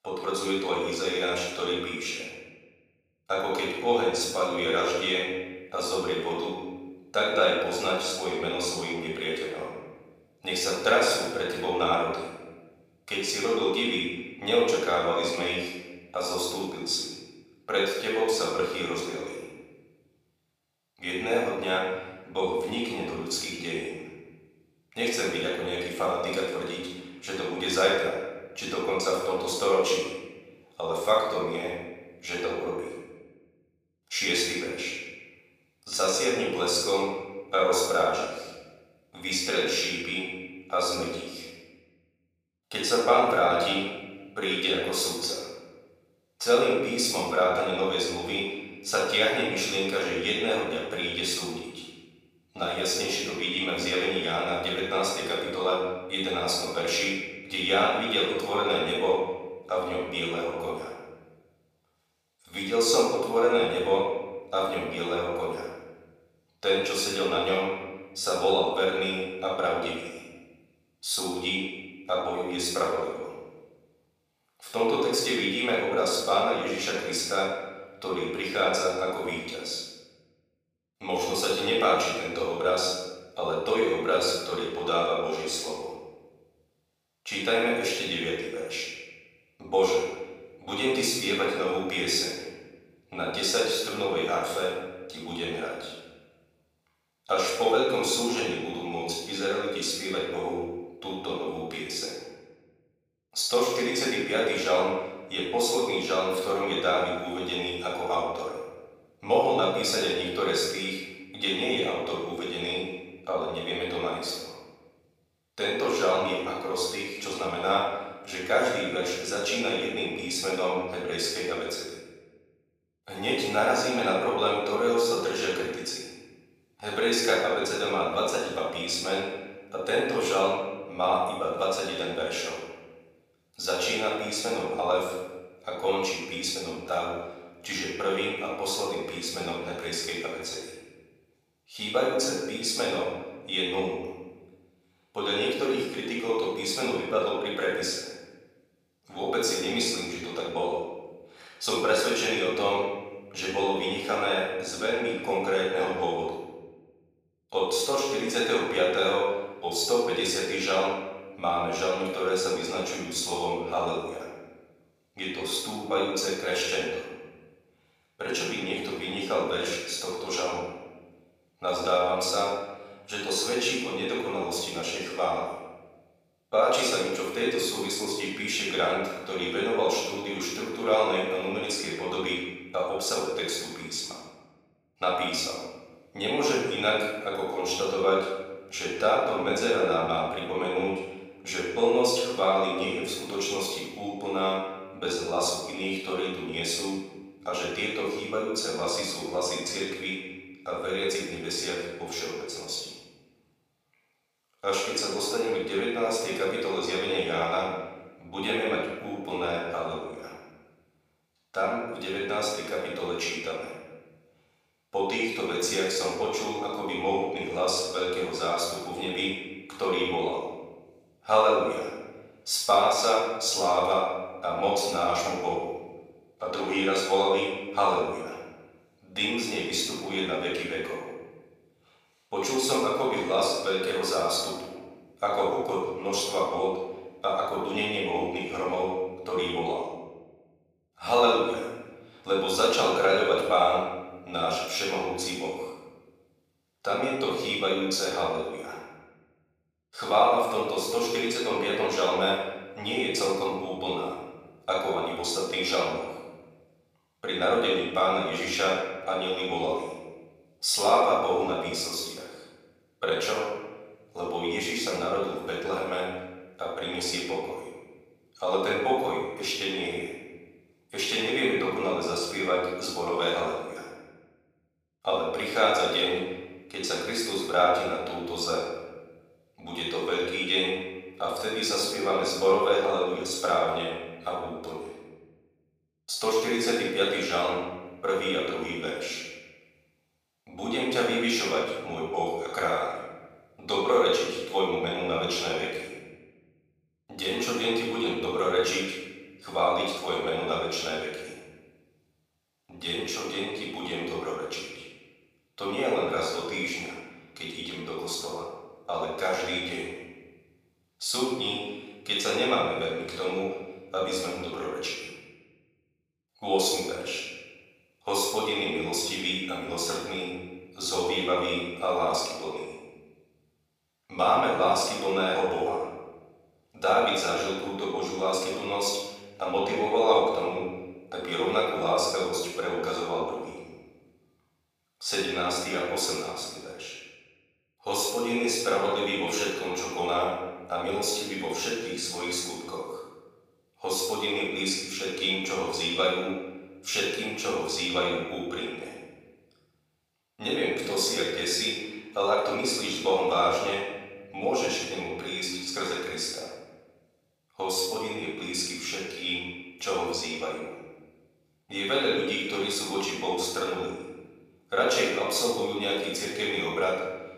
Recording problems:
off-mic speech; far
room echo; noticeable; dies away in 1.3 s
thin; somewhat; fading below 450 Hz

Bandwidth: 15 kHz